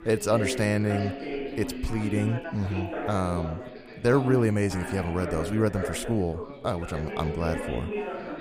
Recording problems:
background chatter; loud; throughout; 4 voices, 7 dB below the speech

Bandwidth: 15 kHz